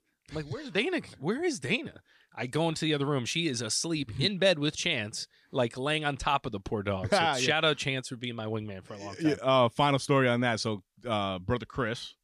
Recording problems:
none

